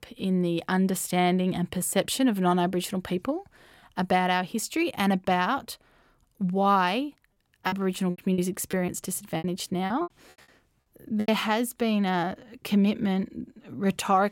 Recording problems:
choppy; very; from 7.5 to 11 s; 15% of the speech affected

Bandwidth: 16.5 kHz